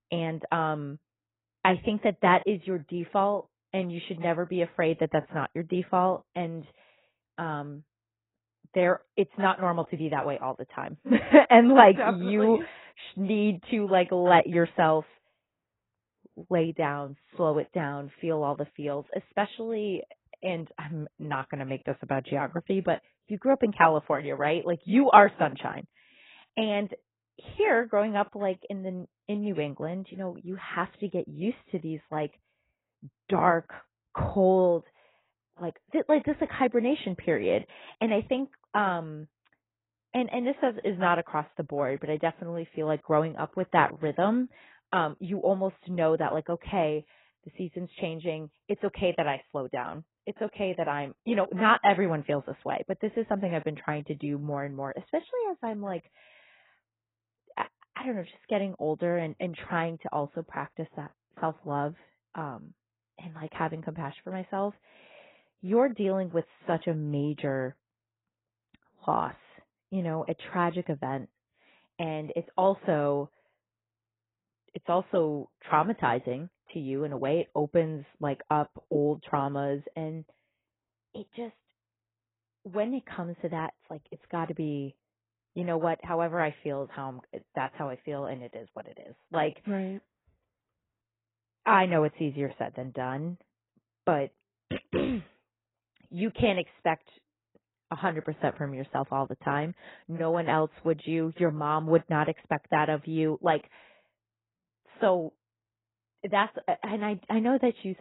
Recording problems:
garbled, watery; badly; nothing above 3.5 kHz
muffled; very slightly; fading above 3 kHz
abrupt cut into speech; at the end

